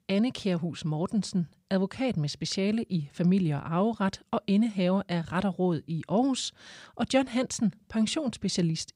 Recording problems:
none

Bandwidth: 15.5 kHz